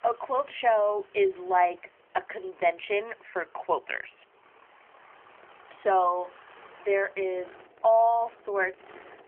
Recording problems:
phone-call audio; nothing above 3.5 kHz
traffic noise; faint; throughout; 25 dB below the speech

